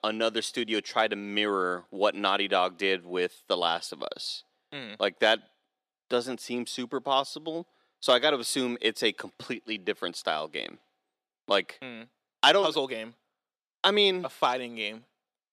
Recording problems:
thin; somewhat; fading below 350 Hz

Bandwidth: 14 kHz